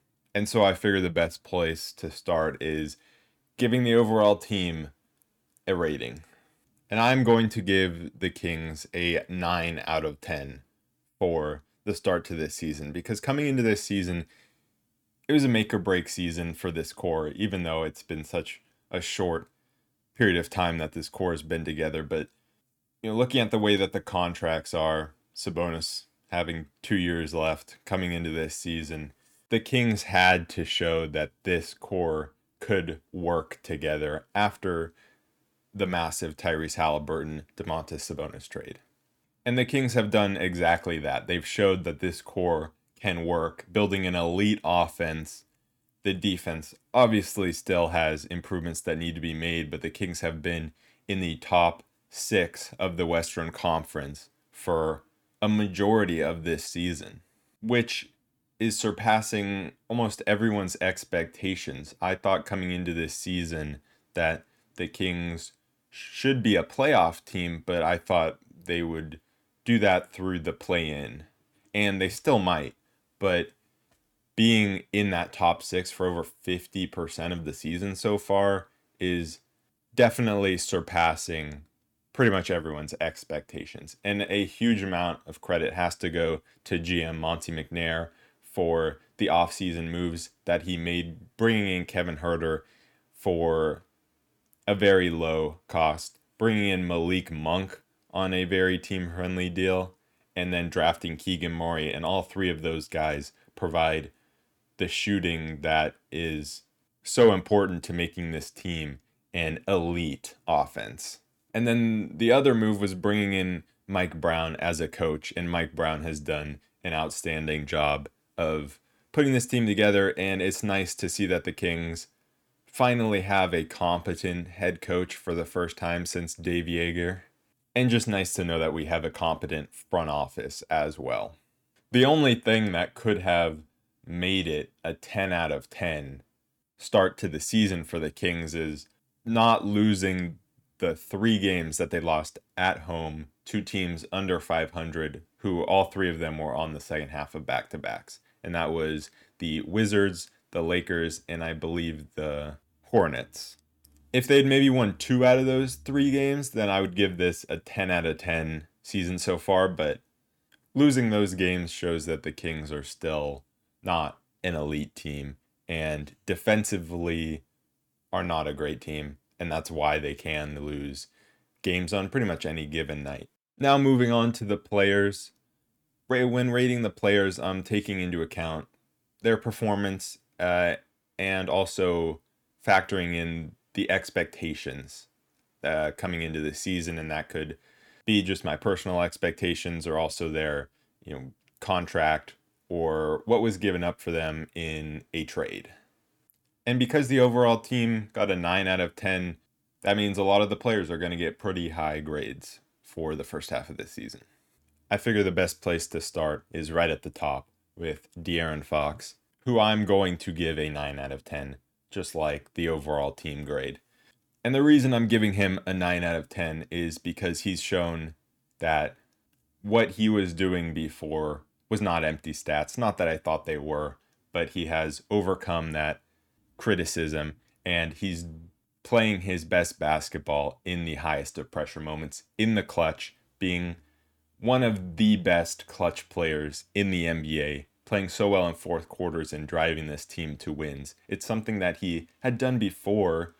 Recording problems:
none

